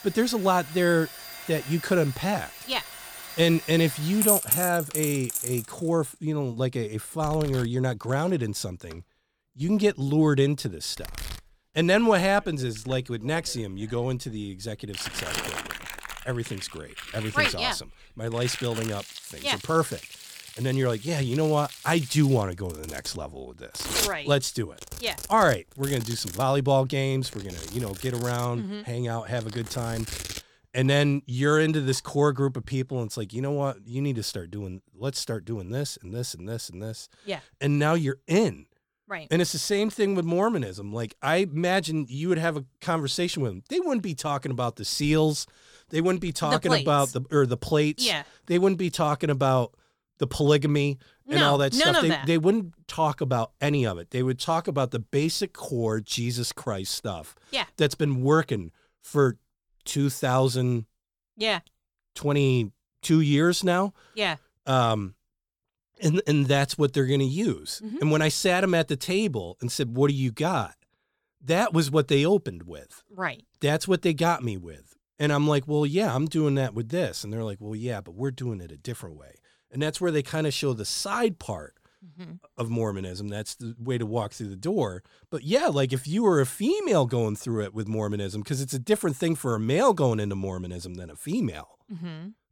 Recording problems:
household noises; loud; until 33 s; 7 dB below the speech

